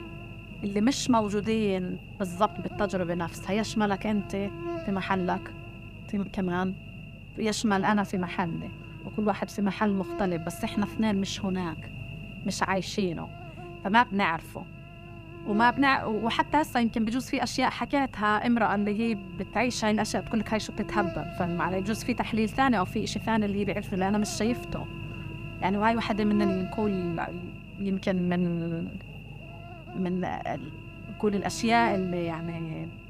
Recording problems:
electrical hum; noticeable; throughout; 50 Hz, 15 dB below the speech

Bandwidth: 15 kHz